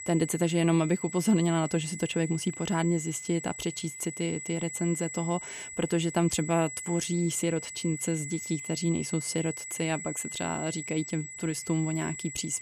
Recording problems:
high-pitched whine; loud; throughout; 8 kHz, 8 dB below the speech

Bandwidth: 14.5 kHz